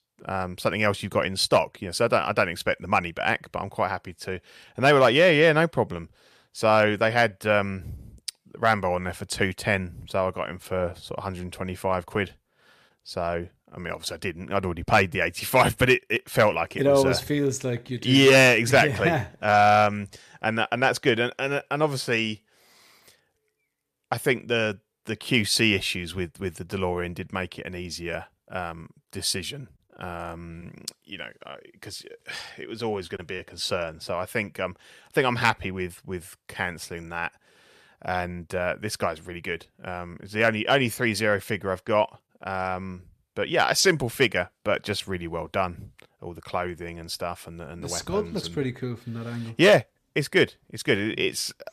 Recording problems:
none

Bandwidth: 14.5 kHz